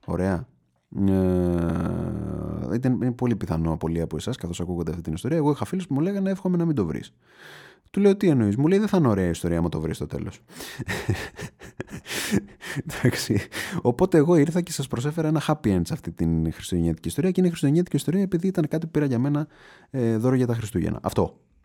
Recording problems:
none

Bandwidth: 18 kHz